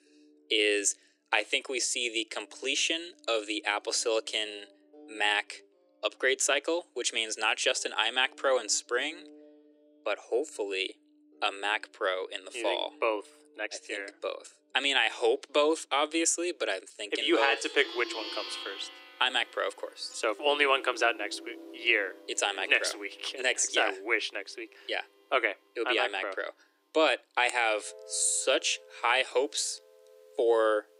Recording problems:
thin; very; fading below 300 Hz
background music; noticeable; throughout; 20 dB below the speech

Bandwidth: 15.5 kHz